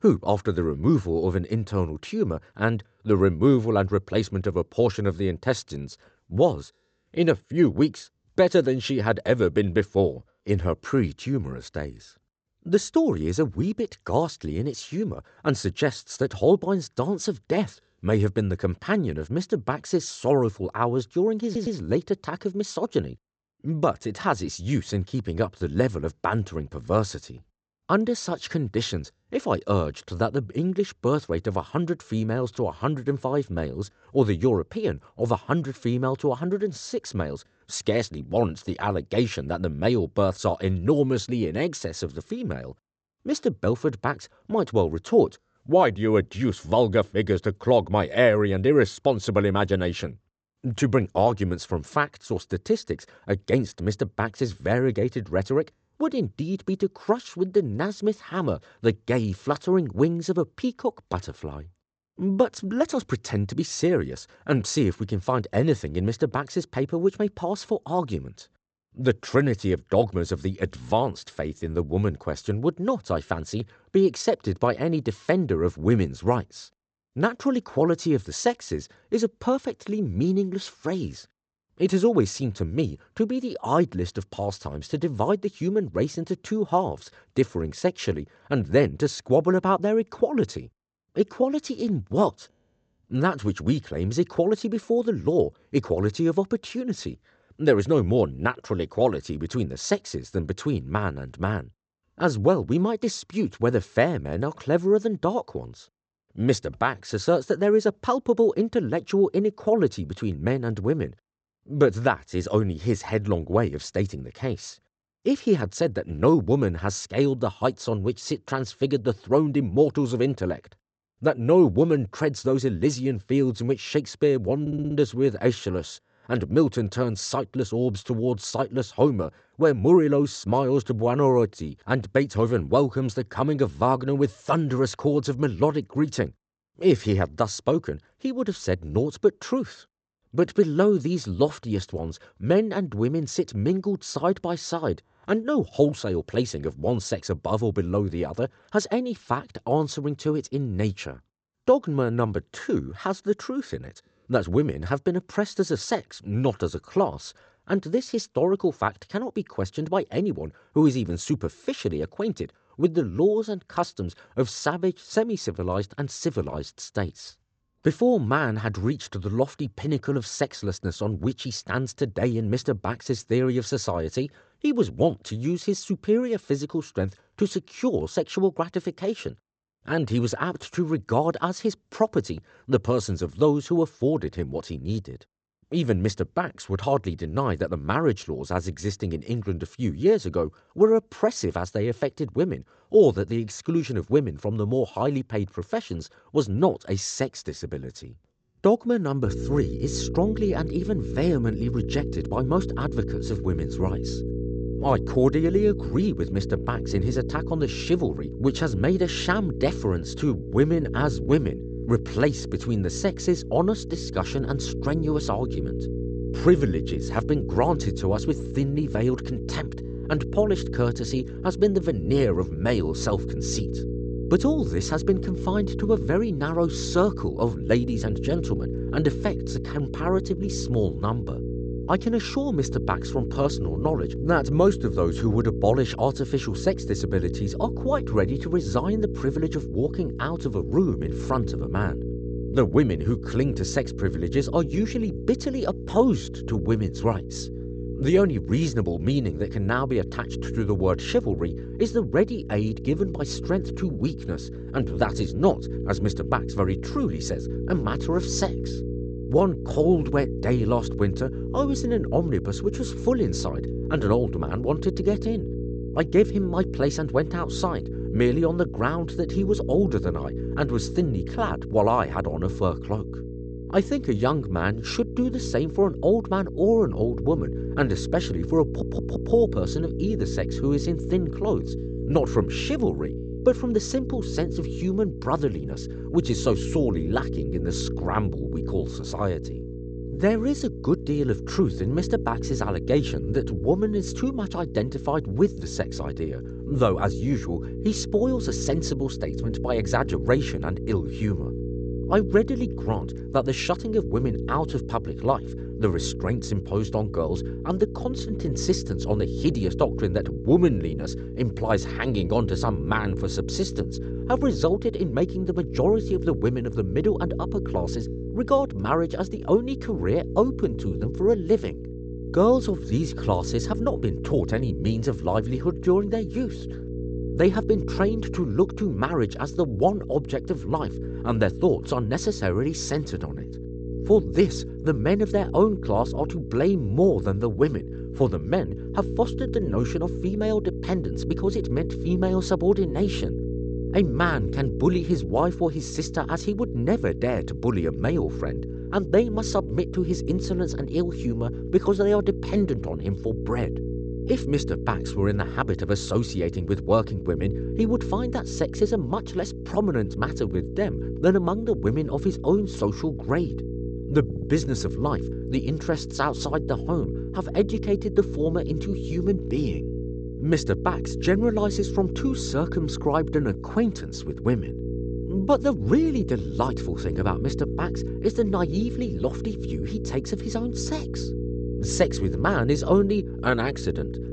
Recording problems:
high frequencies cut off; noticeable; nothing above 8 kHz
electrical hum; noticeable; from 3:19 on; 60 Hz, 10 dB below the speech
audio stuttering; 4 times, first at 21 s

